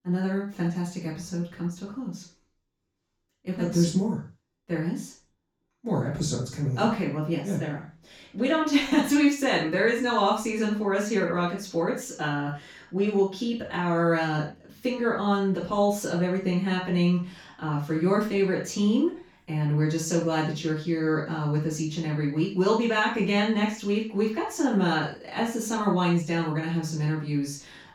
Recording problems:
off-mic speech; far
room echo; noticeable; dies away in 0.3 s

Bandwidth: 17 kHz